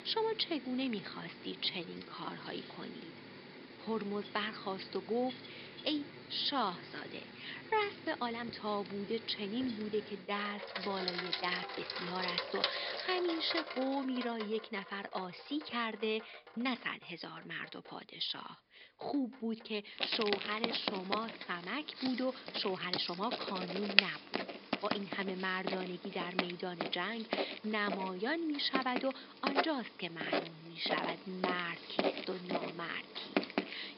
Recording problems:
thin; somewhat; fading below 350 Hz
high frequencies cut off; noticeable; nothing above 5 kHz
household noises; loud; throughout; 2 dB below the speech
uneven, jittery; strongly; from 1.5 to 32 s

